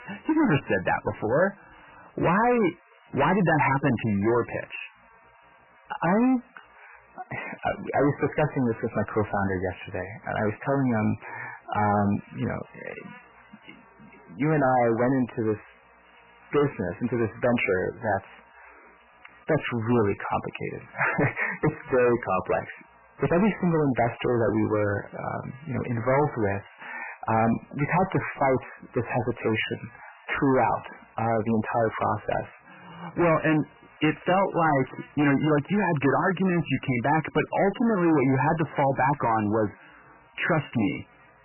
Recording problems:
distortion; heavy; 11% of the sound clipped
garbled, watery; badly; nothing above 3 kHz
electrical hum; faint; throughout; 60 Hz, 25 dB below the speech

